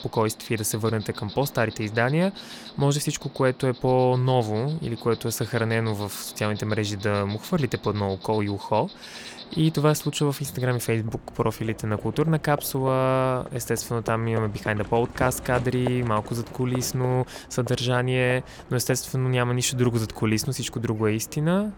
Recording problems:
animal sounds; noticeable; throughout; 15 dB below the speech

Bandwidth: 17.5 kHz